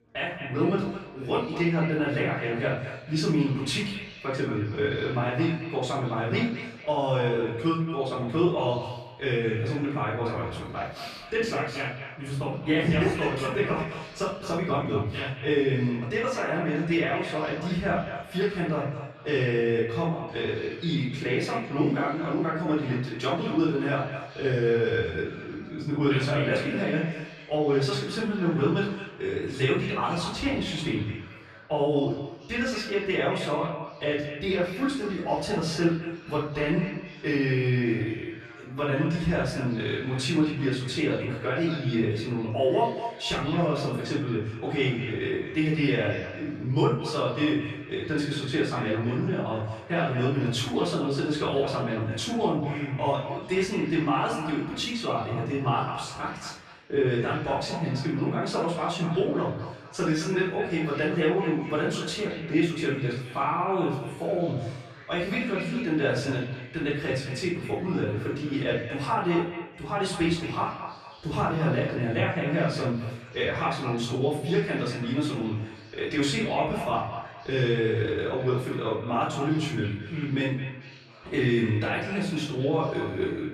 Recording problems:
echo of what is said; strong; throughout; 220 ms later, 10 dB below the speech
off-mic speech; far
room echo; noticeable; dies away in 0.5 s
chatter from many people; faint; throughout; 25 dB below the speech

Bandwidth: 13.5 kHz